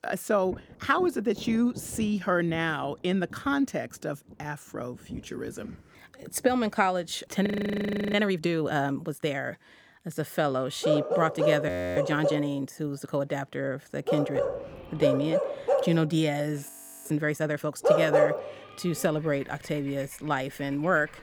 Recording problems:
animal sounds; very loud; from 11 s on; 1 dB above the speech
rain or running water; noticeable; throughout; 20 dB below the speech
audio freezing; at 7.5 s for 0.5 s, at 12 s and at 17 s

